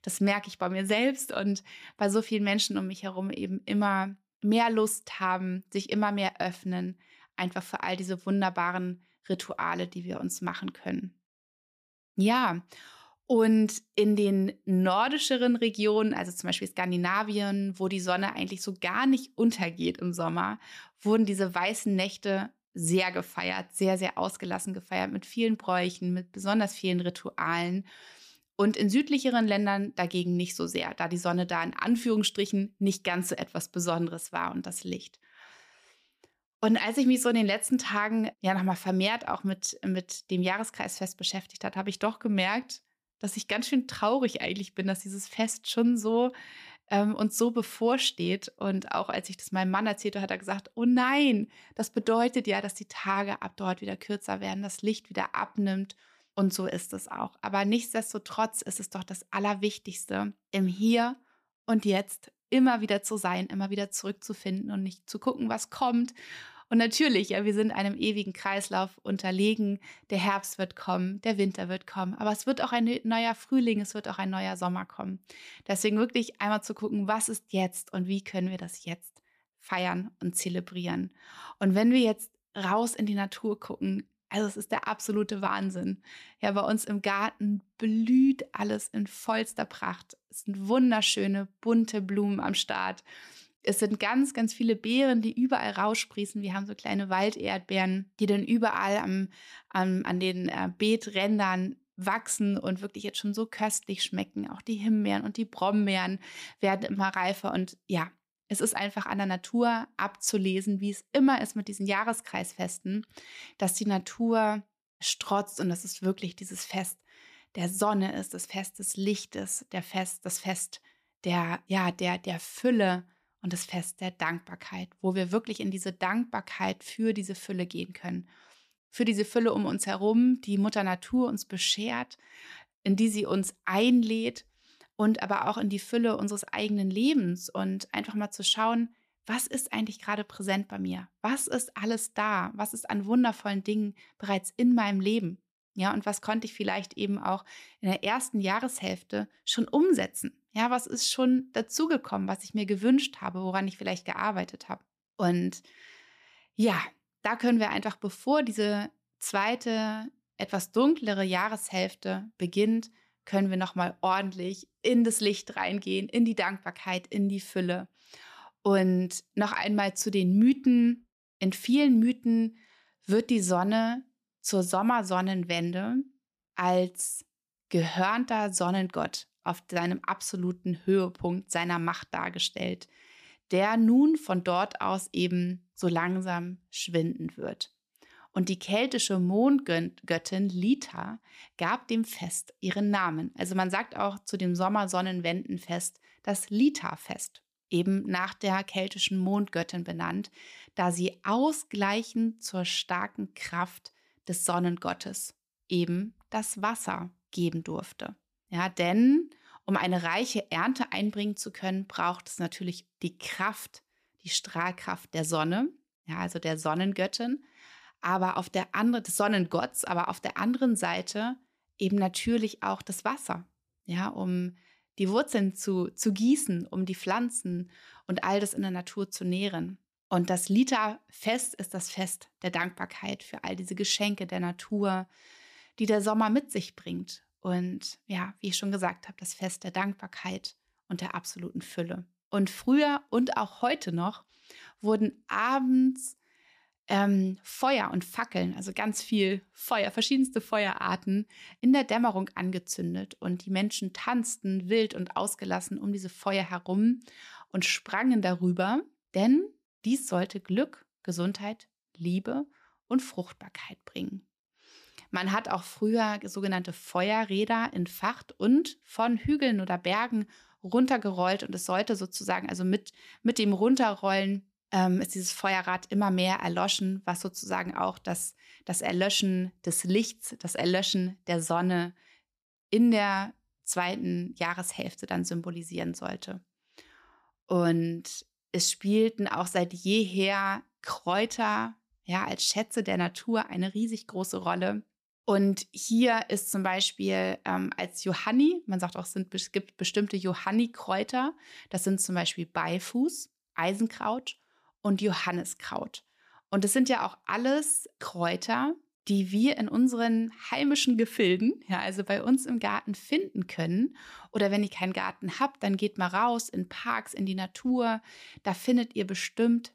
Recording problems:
none

